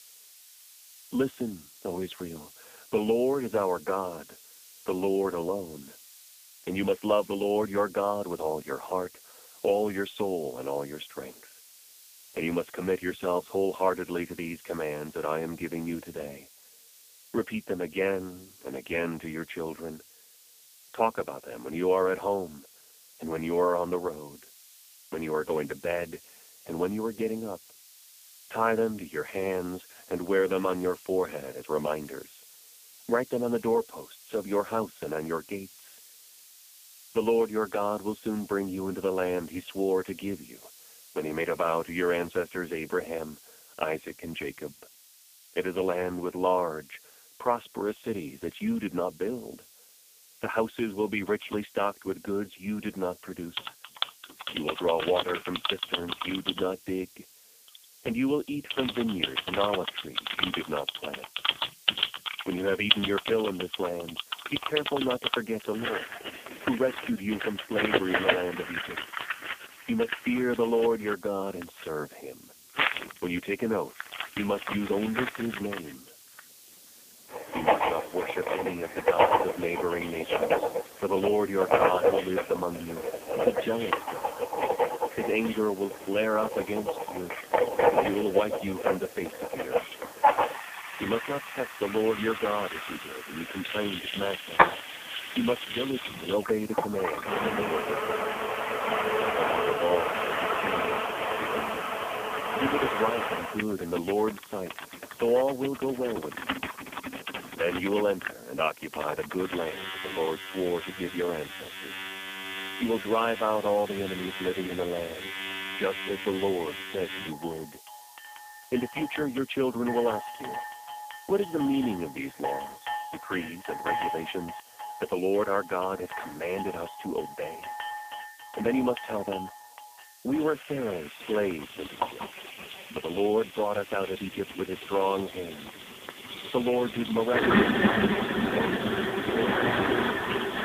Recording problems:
phone-call audio; poor line
household noises; loud; from 52 s on; 1 dB below the speech
hiss; noticeable; throughout; 20 dB below the speech

